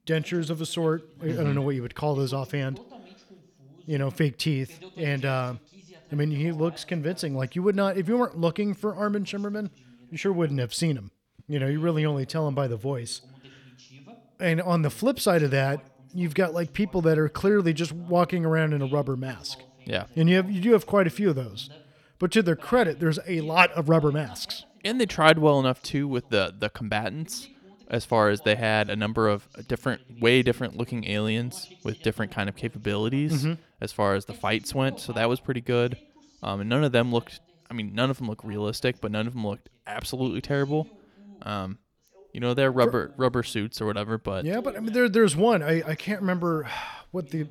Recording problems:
voice in the background; faint; throughout; 25 dB below the speech

